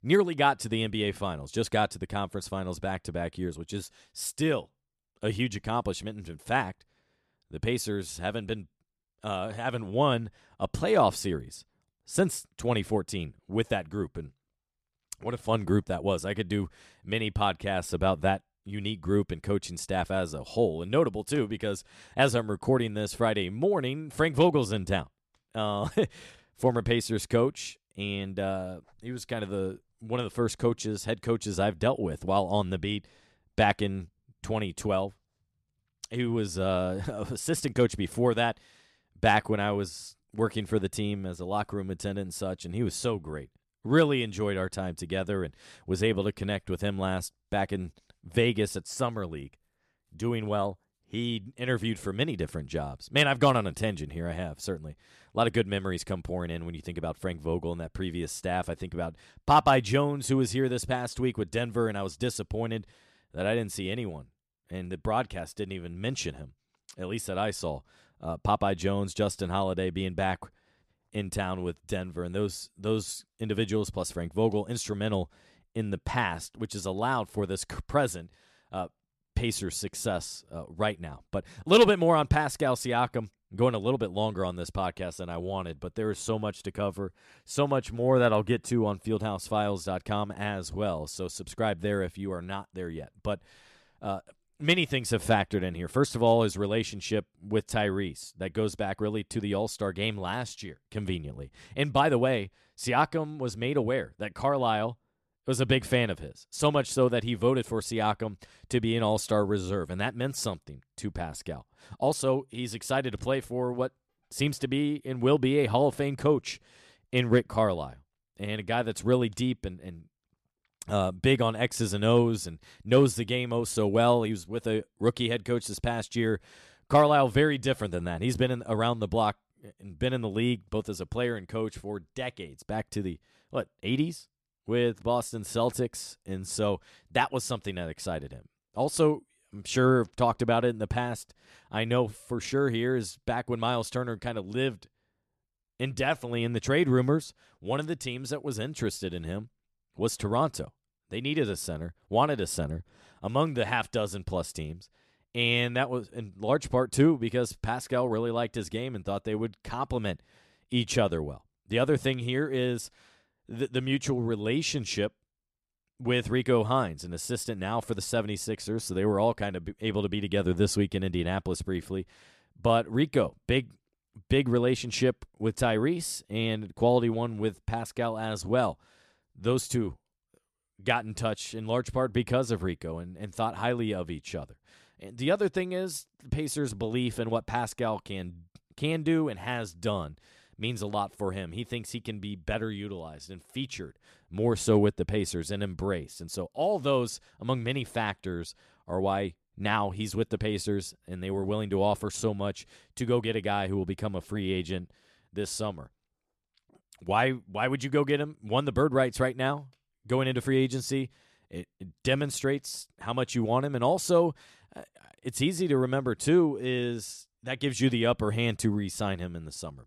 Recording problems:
none

